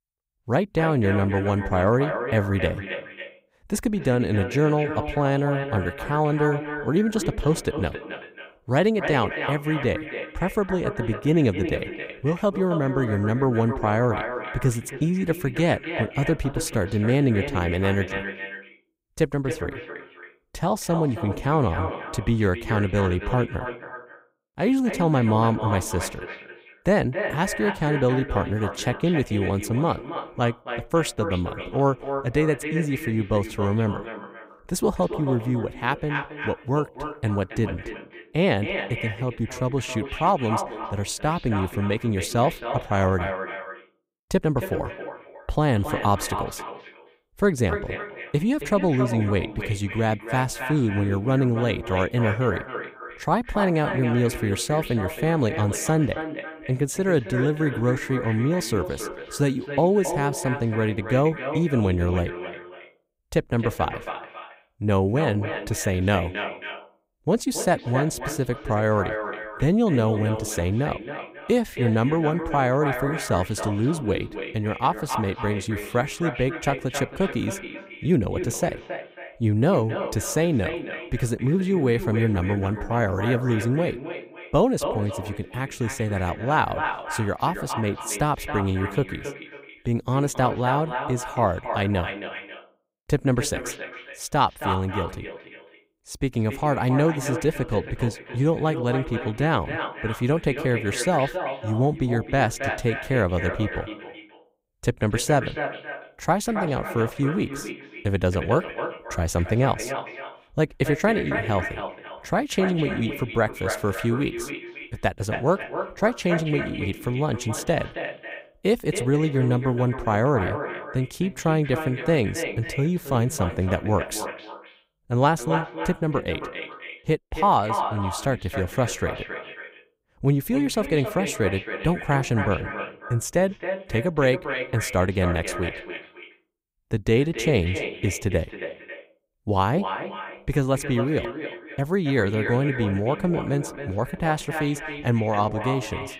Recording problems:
echo of what is said; strong; throughout; 270 ms later, 8 dB below the speech

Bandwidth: 15.5 kHz